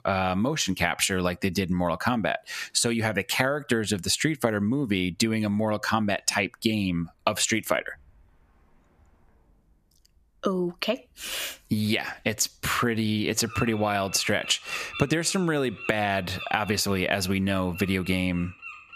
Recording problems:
squashed, flat; somewhat, background pumping
animal sounds; noticeable; throughout; 15 dB below the speech

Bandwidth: 14.5 kHz